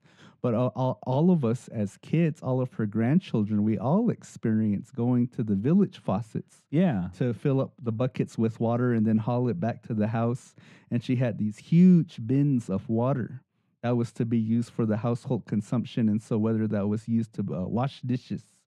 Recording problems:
muffled; very; fading above 2.5 kHz

